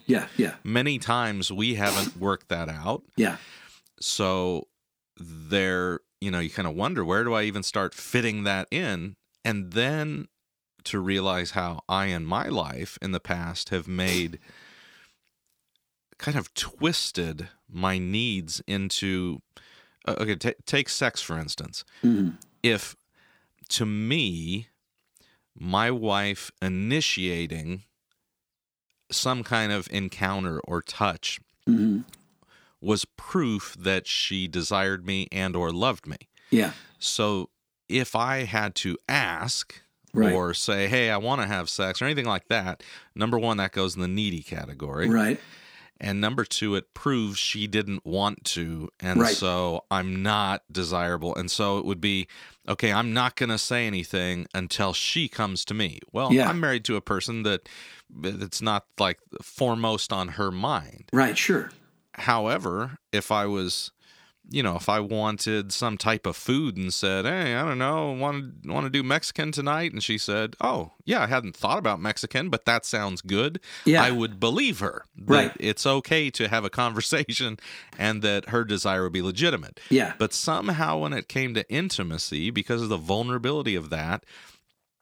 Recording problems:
none

